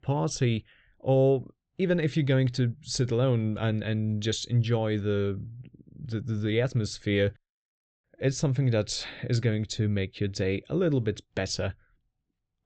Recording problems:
high frequencies cut off; noticeable; nothing above 8 kHz

